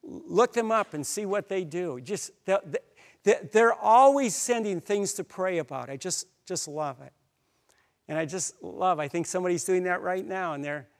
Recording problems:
none

